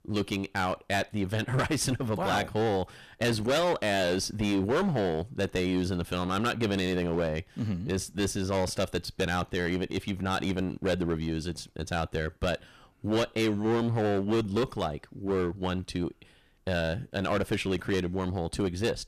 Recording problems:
distortion; heavy; 14% of the sound clipped

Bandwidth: 14.5 kHz